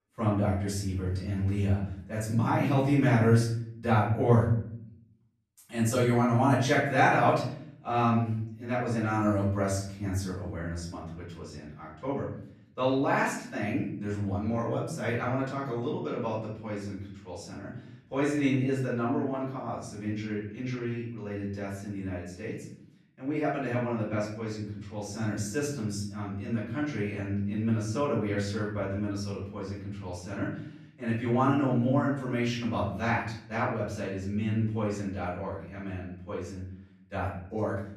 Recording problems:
off-mic speech; far
room echo; noticeable; dies away in 0.7 s

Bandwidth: 14.5 kHz